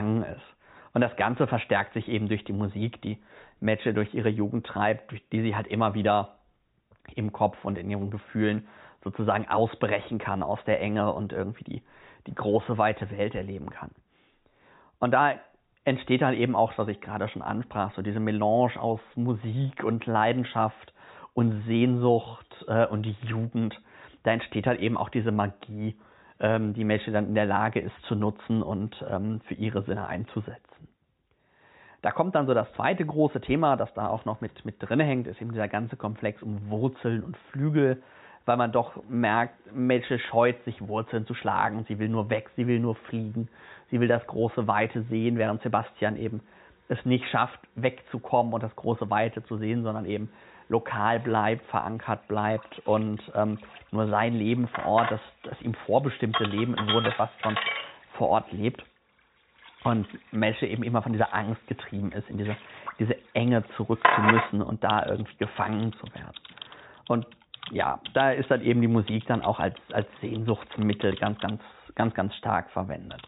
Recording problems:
high frequencies cut off; severe; nothing above 4 kHz
household noises; loud; throughout; 4 dB below the speech
abrupt cut into speech; at the start

